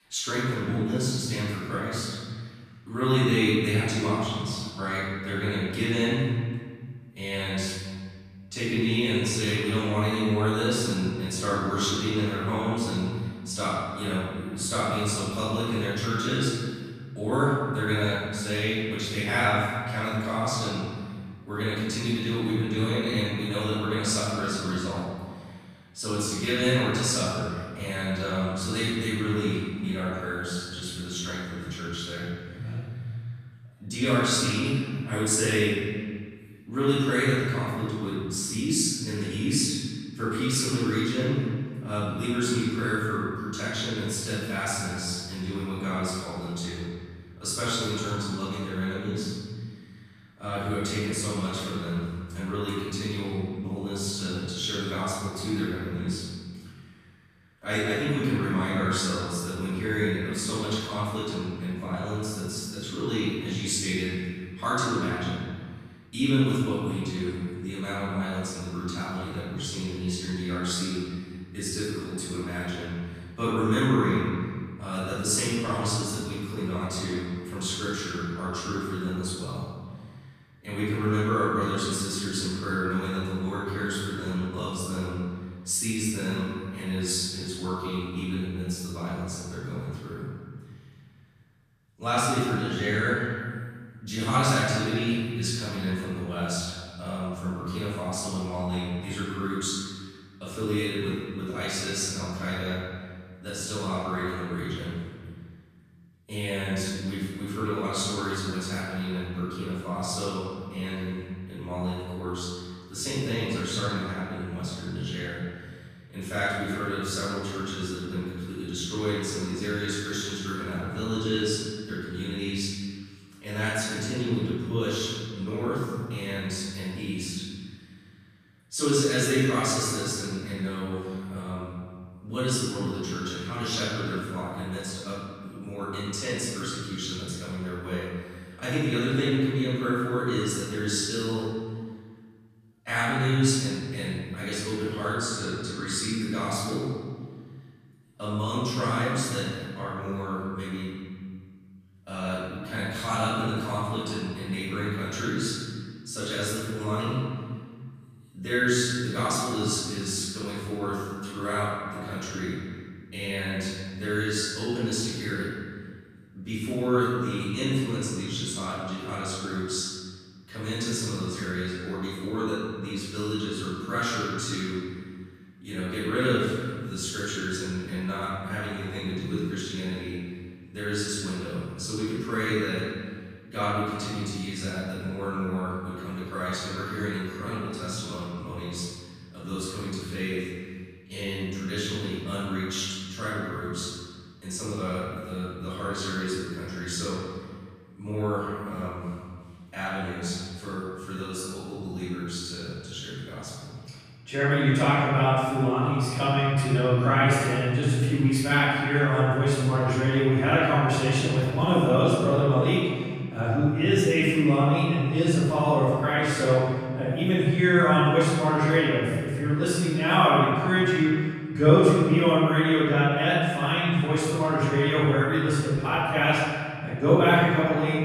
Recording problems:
room echo; strong; dies away in 1.7 s
off-mic speech; far

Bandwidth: 14.5 kHz